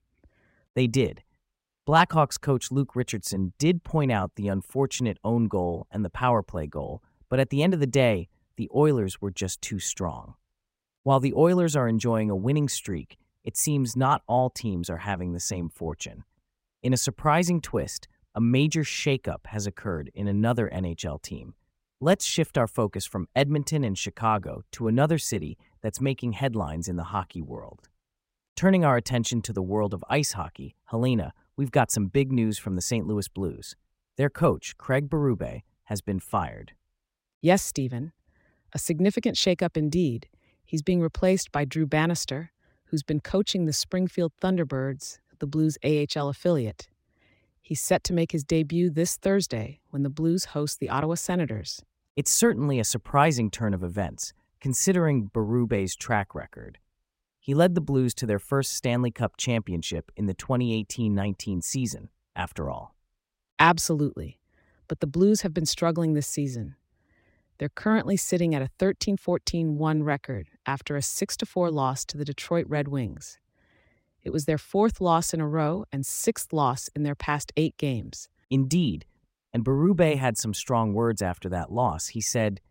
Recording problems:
none

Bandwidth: 16 kHz